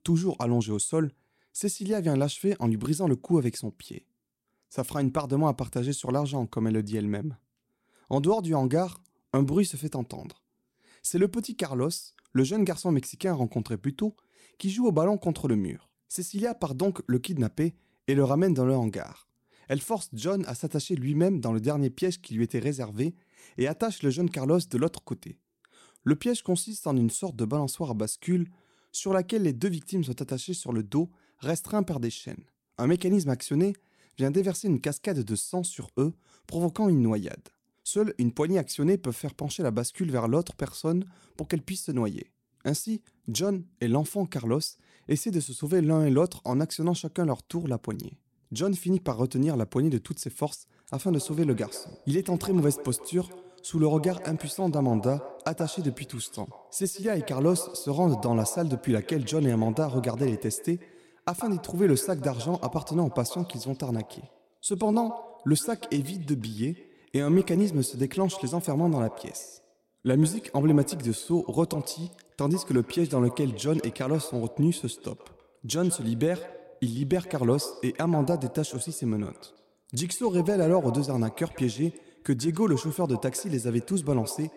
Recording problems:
echo of what is said; noticeable; from 51 s on; 130 ms later, 15 dB below the speech

